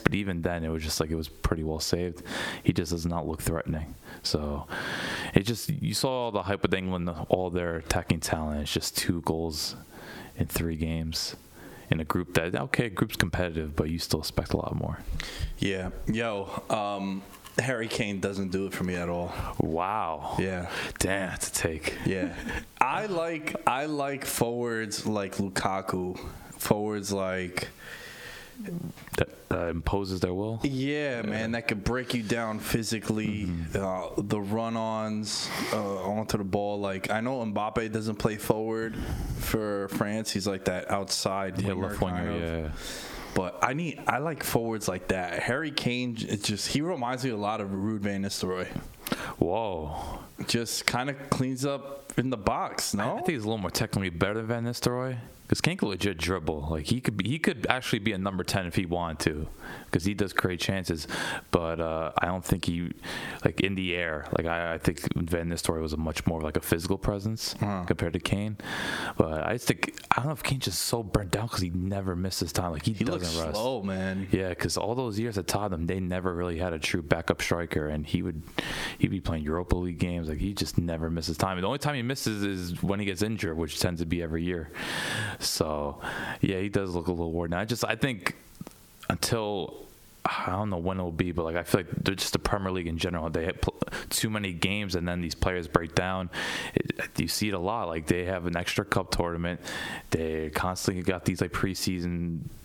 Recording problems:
squashed, flat; heavily

